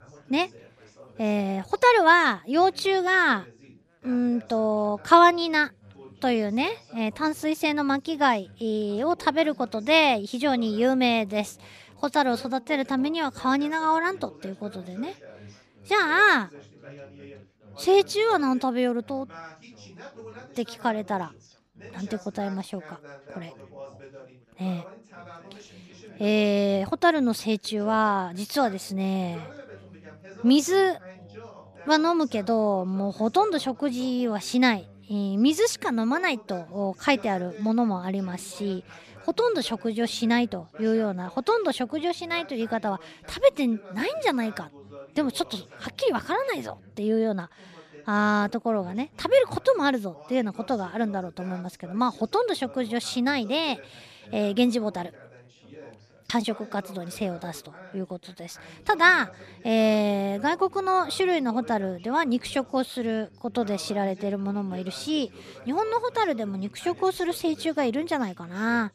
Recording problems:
background chatter; faint; throughout; 3 voices, 25 dB below the speech

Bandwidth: 14.5 kHz